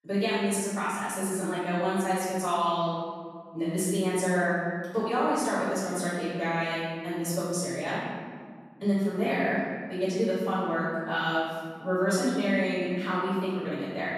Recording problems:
room echo; strong; dies away in 1.8 s
off-mic speech; far

